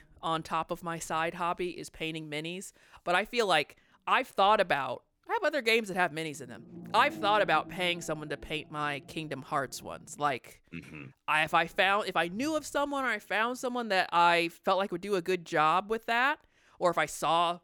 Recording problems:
low rumble; faint; until 4 s, from 6.5 to 10 s and from 12 to 15 s; 25 dB below the speech

